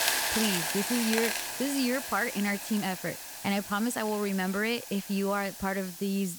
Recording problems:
hiss; loud; throughout; 3 dB below the speech

